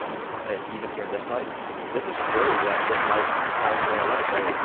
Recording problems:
phone-call audio; poor line
traffic noise; very loud; throughout; 4 dB above the speech

